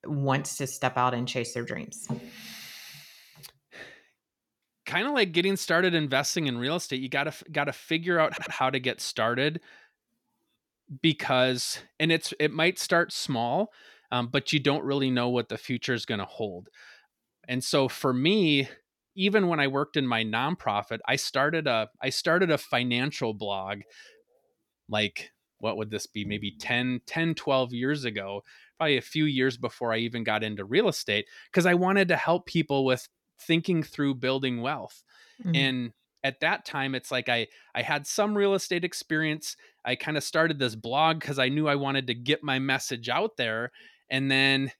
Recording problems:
audio stuttering; at 8.5 s

